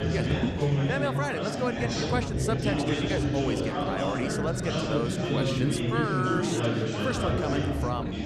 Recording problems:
chatter from many people; very loud; throughout; 4 dB above the speech

